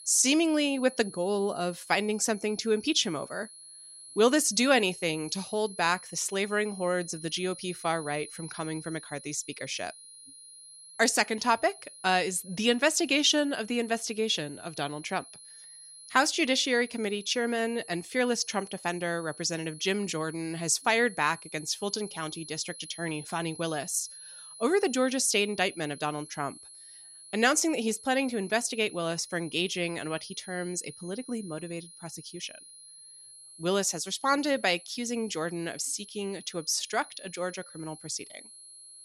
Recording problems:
high-pitched whine; noticeable; throughout; 10.5 kHz, 15 dB below the speech

